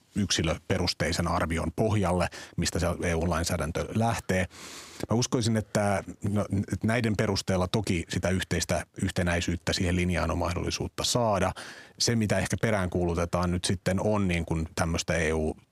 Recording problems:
squashed, flat; somewhat

